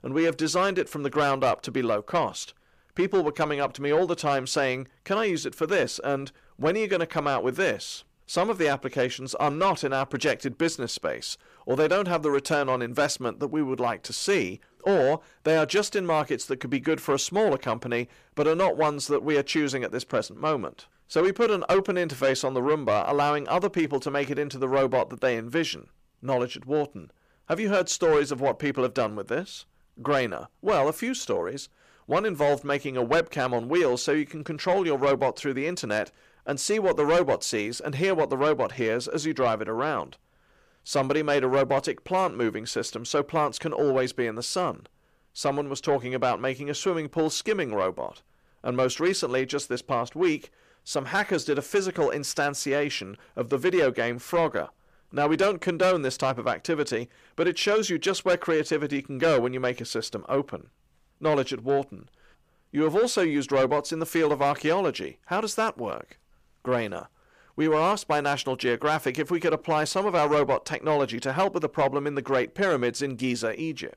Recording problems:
distortion; slight; 10 dB below the speech

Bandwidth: 15 kHz